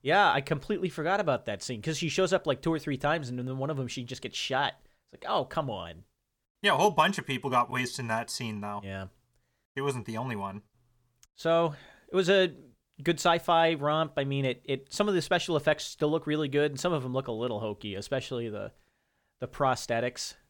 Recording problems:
none

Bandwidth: 17.5 kHz